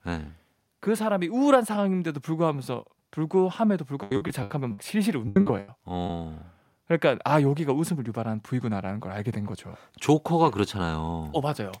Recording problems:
choppy; very; from 4 to 6 s; 23% of the speech affected

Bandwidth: 16 kHz